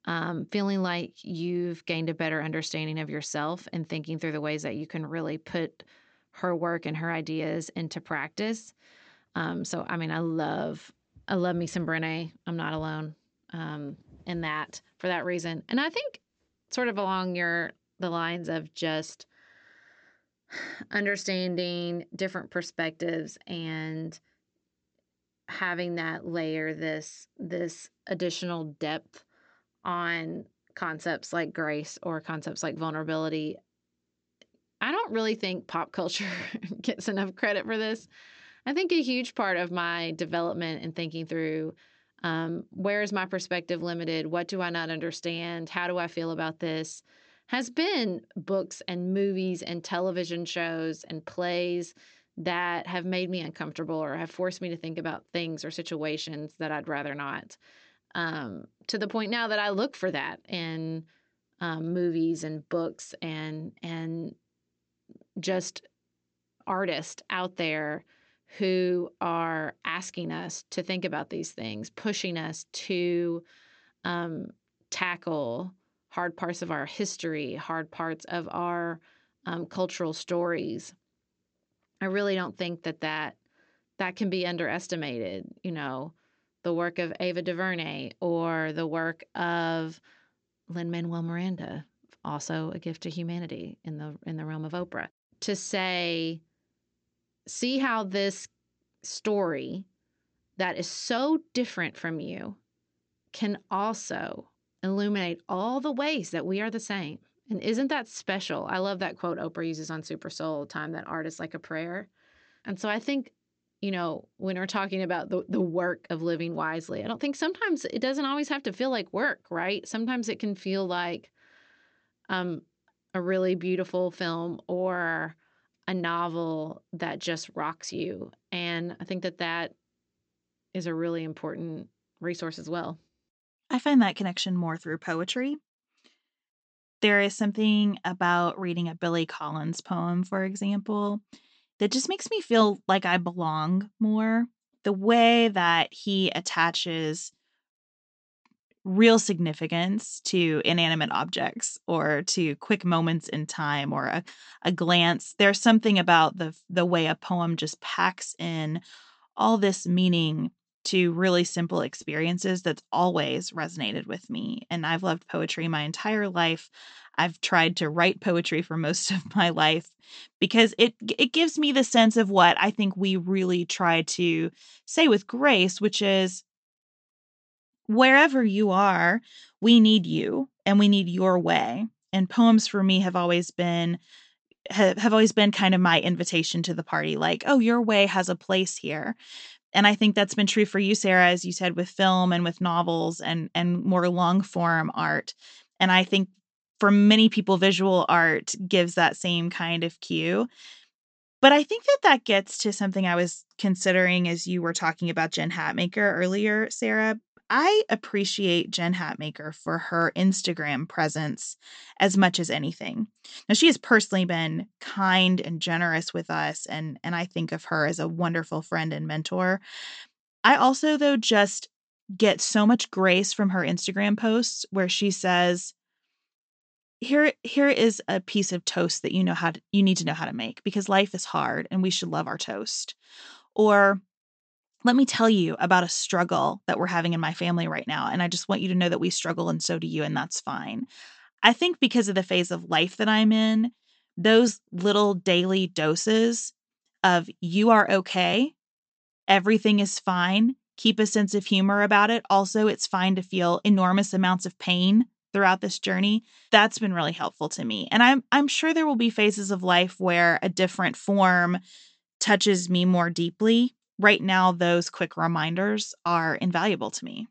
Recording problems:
high frequencies cut off; noticeable; nothing above 8 kHz

